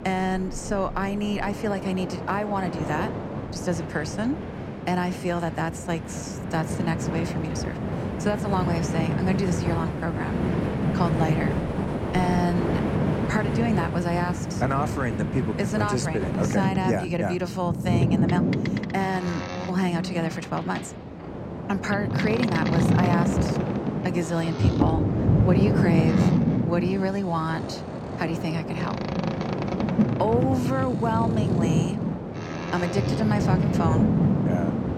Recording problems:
train or aircraft noise; very loud; throughout; 2 dB above the speech

